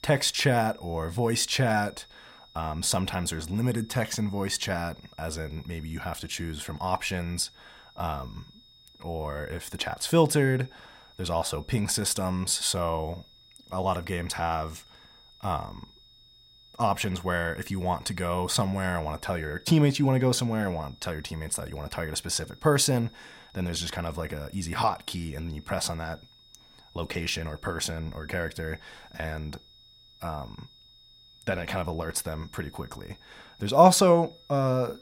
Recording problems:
high-pitched whine; faint; throughout; 3.5 kHz, 25 dB below the speech

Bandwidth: 16 kHz